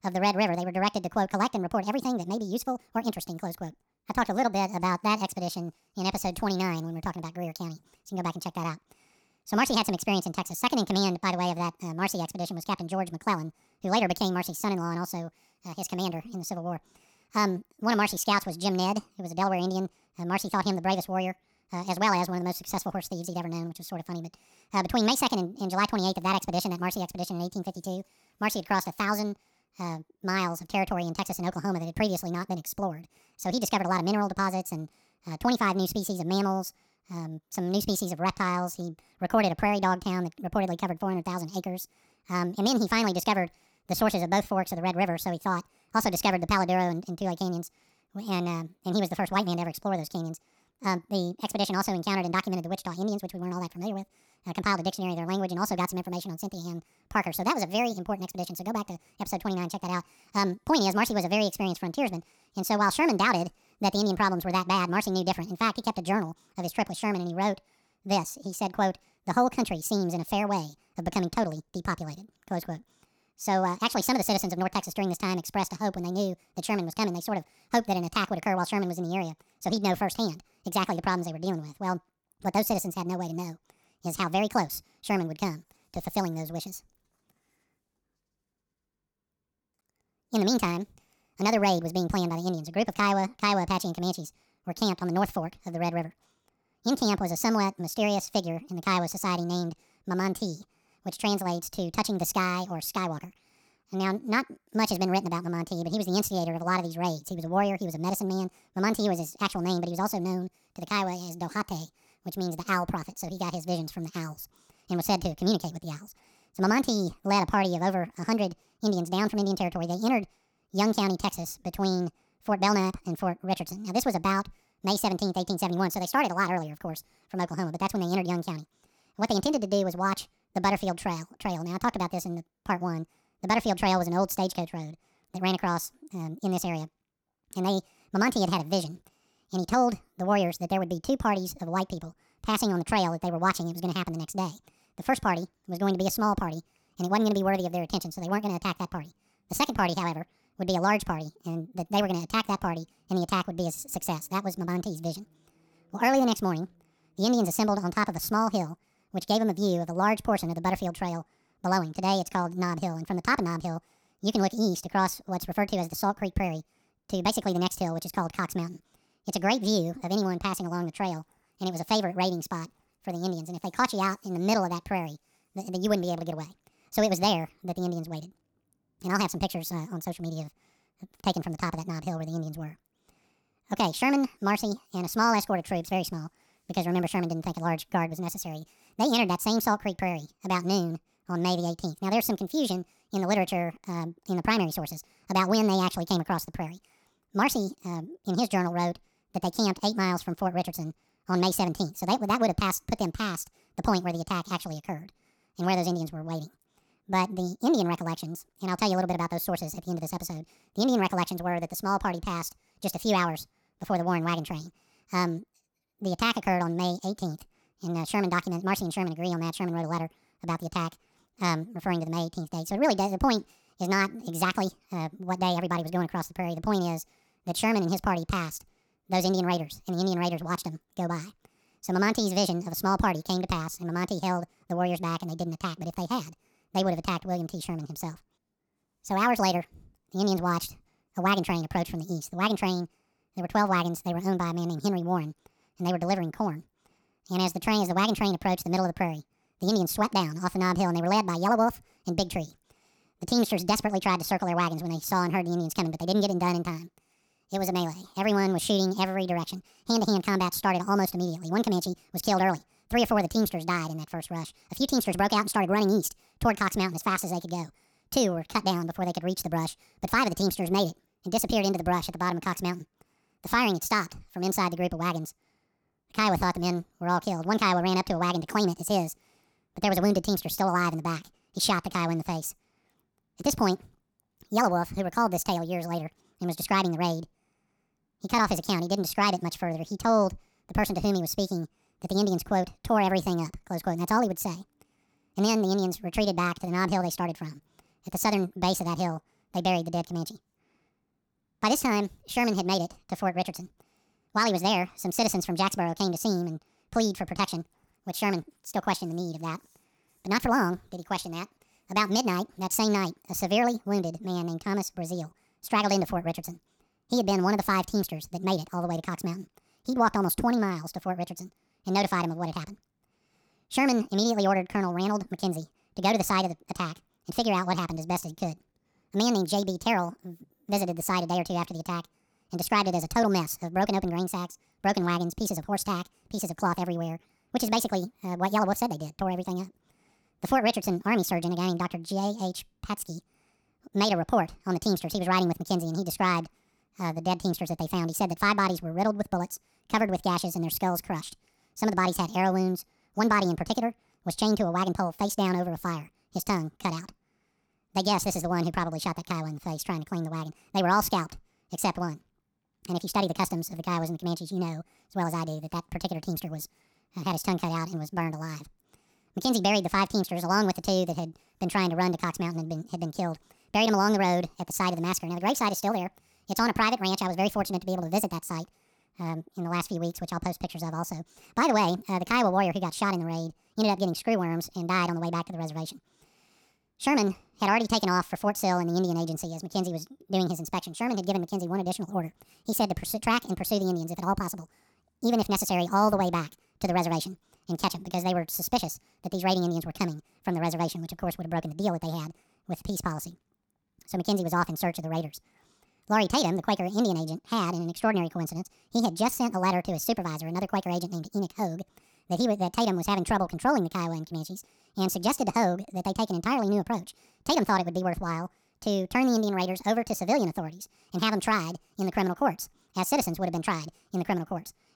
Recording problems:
wrong speed and pitch; too fast and too high; 1.7 times normal speed

